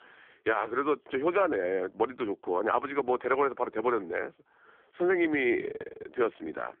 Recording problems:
phone-call audio; poor line; nothing above 3.5 kHz

